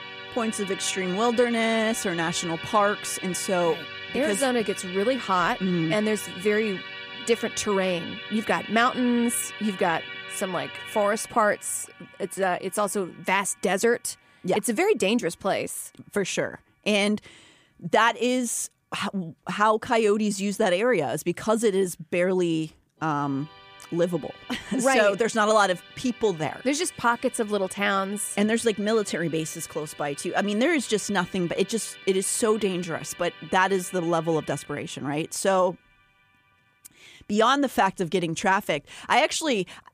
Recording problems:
background music; noticeable; throughout; 15 dB below the speech

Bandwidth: 15 kHz